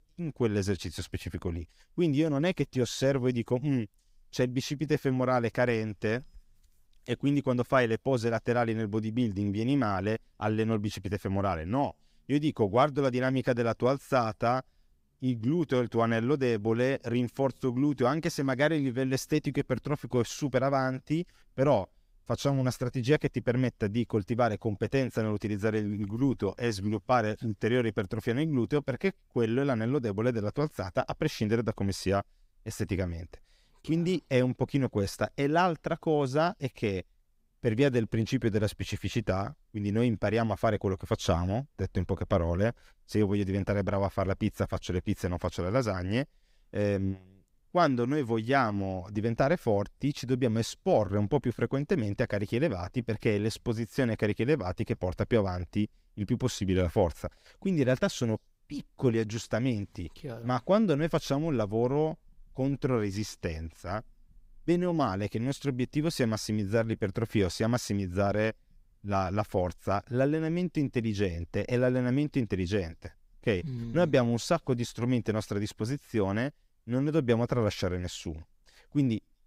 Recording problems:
none

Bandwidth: 15.5 kHz